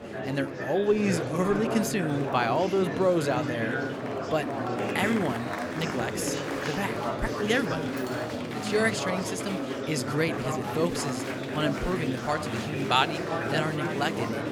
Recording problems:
murmuring crowd; loud; throughout; 2 dB below the speech
clattering dishes; faint; at 8 s; peak 15 dB below the speech

